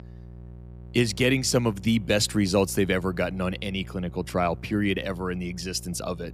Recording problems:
electrical hum; faint; throughout; 60 Hz, 25 dB below the speech

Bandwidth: 15 kHz